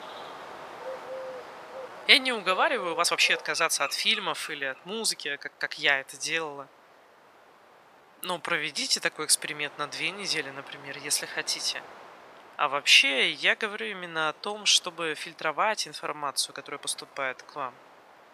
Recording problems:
thin; very; fading below 850 Hz
animal sounds; noticeable; until 4.5 s; 15 dB below the speech
wind noise on the microphone; occasional gusts; 25 dB below the speech
uneven, jittery; strongly; from 2 to 18 s

